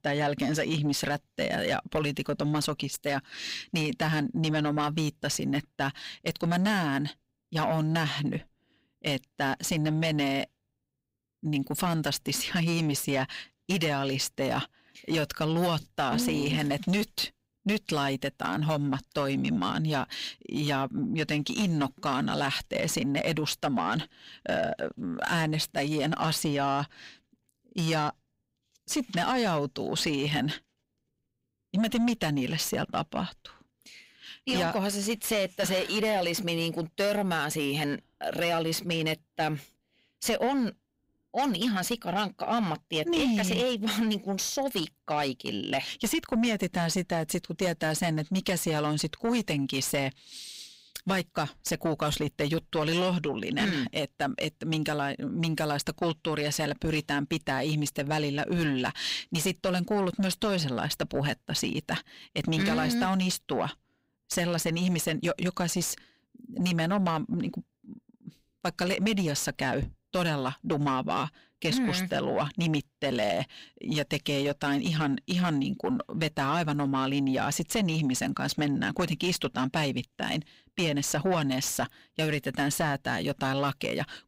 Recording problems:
distortion; slight; 10 dB below the speech

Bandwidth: 15.5 kHz